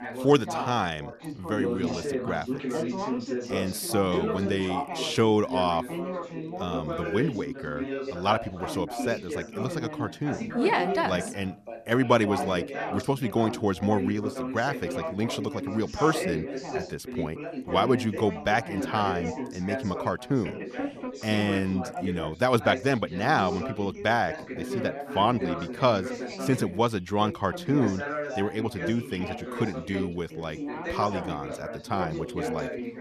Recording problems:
background chatter; loud; throughout; 3 voices, 6 dB below the speech

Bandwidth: 13.5 kHz